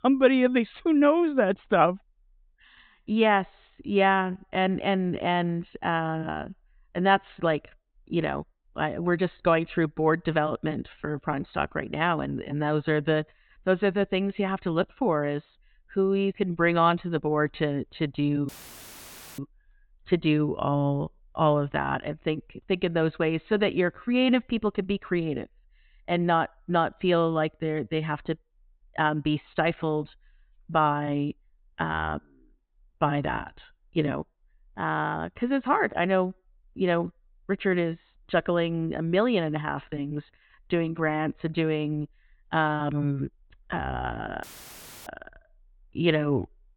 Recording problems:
high frequencies cut off; severe; nothing above 4 kHz
audio cutting out; filled with static; at 18 s for 1 s and at 44 s for 0.5 s

